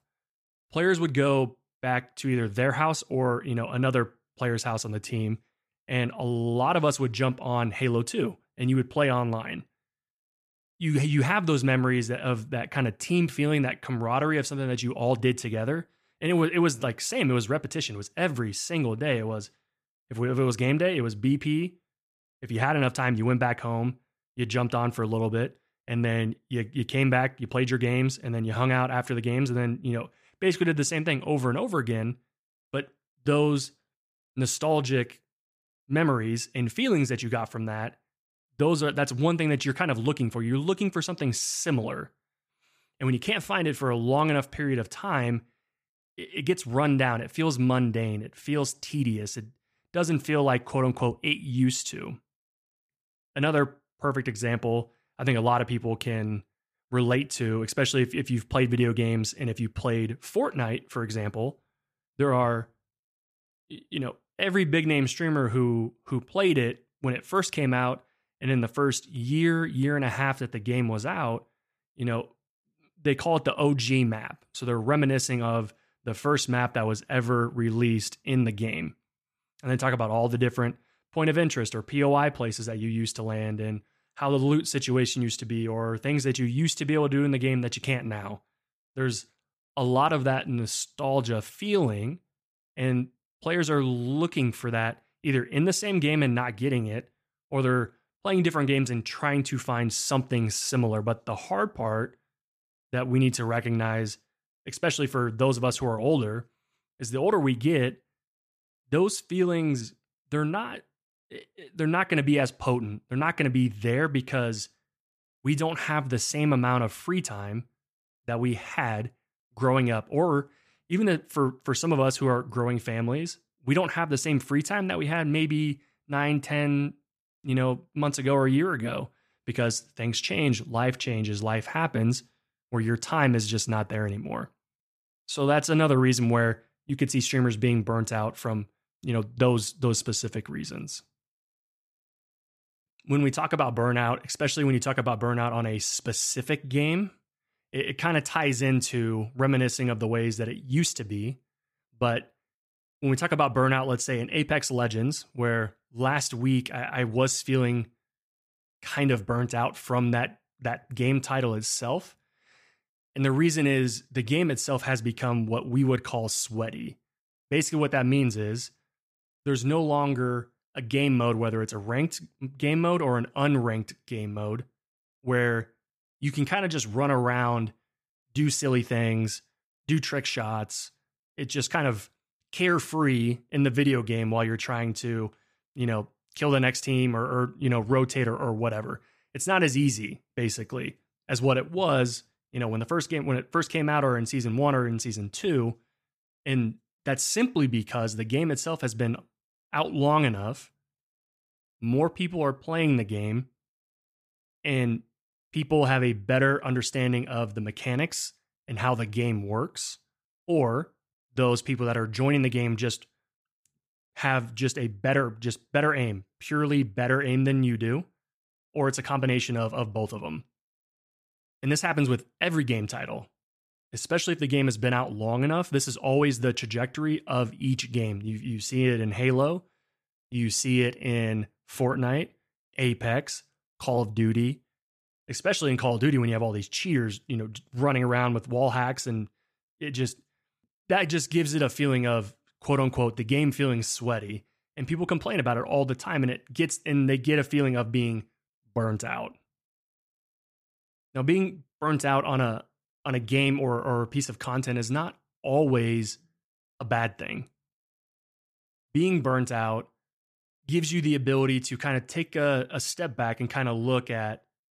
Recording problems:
none

